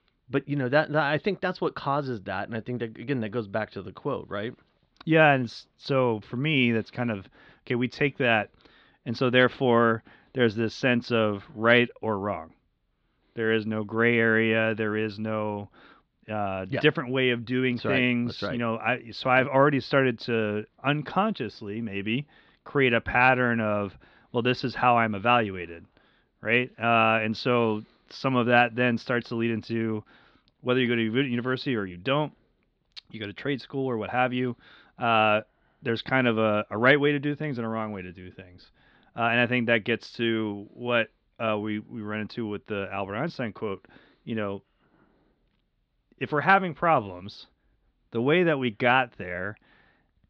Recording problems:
muffled; slightly; fading above 4 kHz

